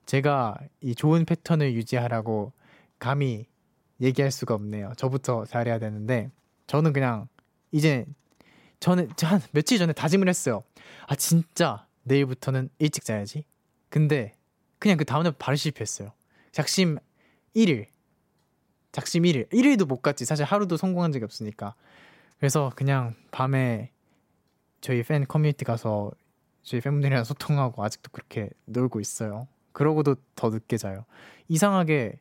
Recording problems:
none

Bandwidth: 16 kHz